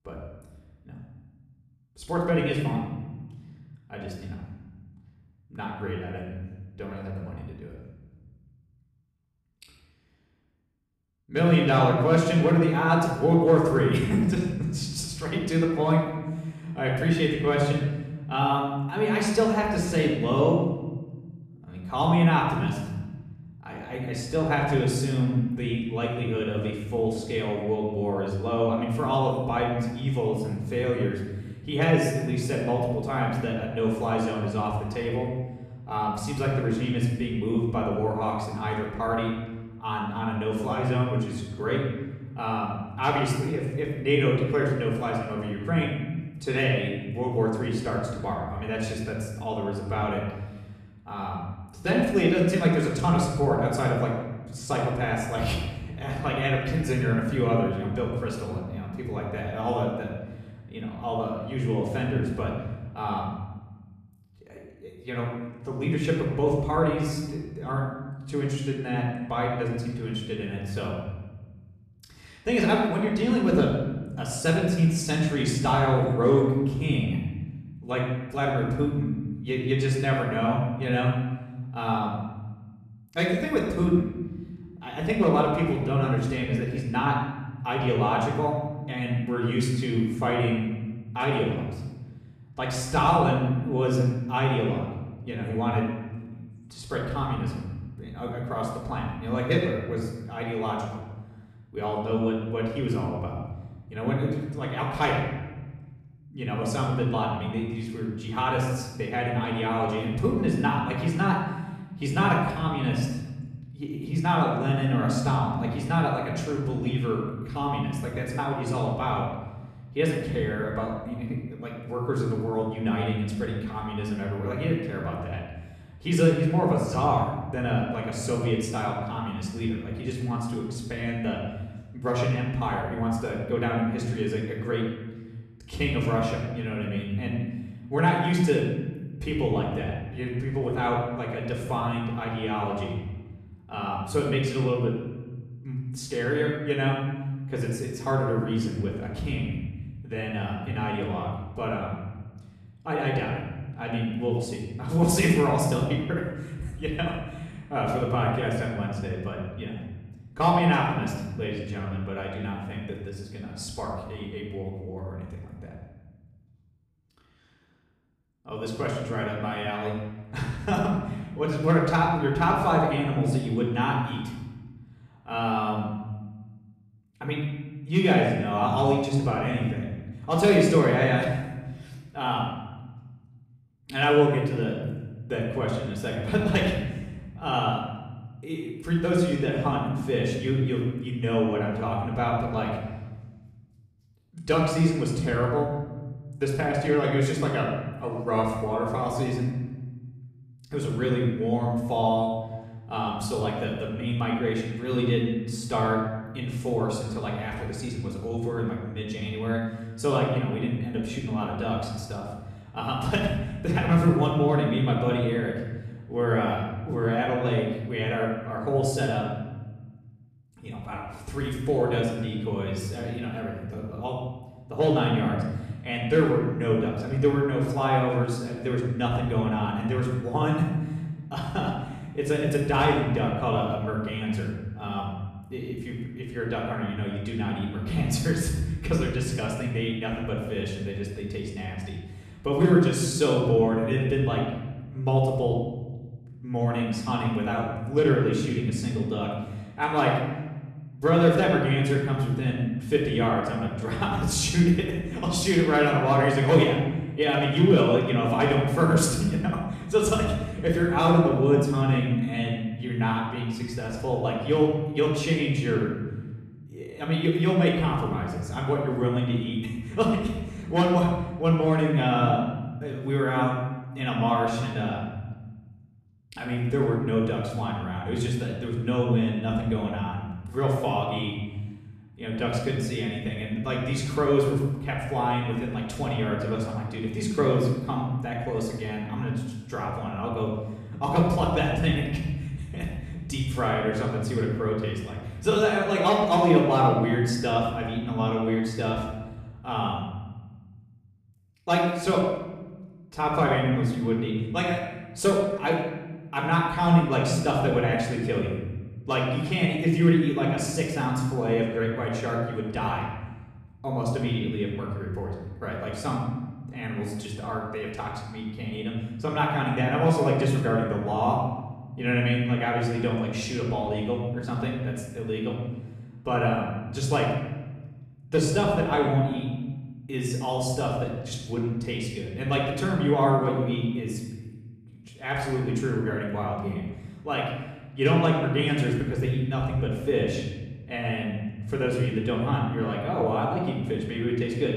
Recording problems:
off-mic speech; far
room echo; noticeable; dies away in 1.2 s

